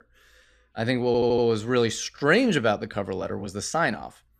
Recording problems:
audio stuttering; at 1 s

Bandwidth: 15 kHz